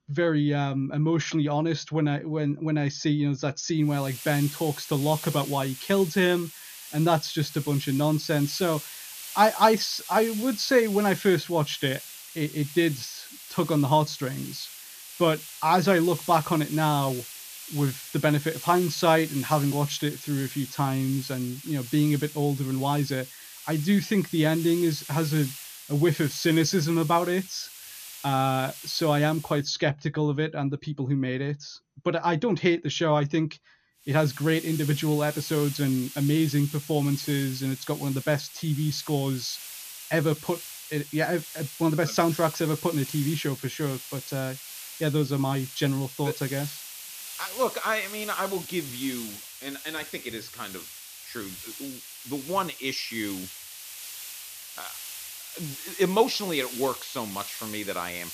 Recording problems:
garbled, watery; slightly; nothing above 6.5 kHz
hiss; noticeable; from 4 to 30 s and from 34 s on; 10 dB below the speech

